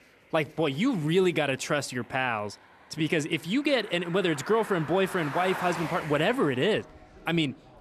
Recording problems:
traffic noise; noticeable; throughout; 10 dB below the speech

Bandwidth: 13.5 kHz